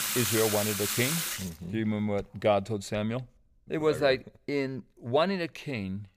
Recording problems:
household noises; very loud; throughout; as loud as the speech

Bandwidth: 15 kHz